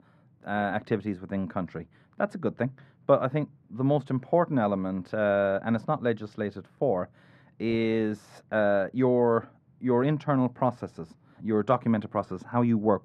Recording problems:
muffled; very; fading above 3 kHz

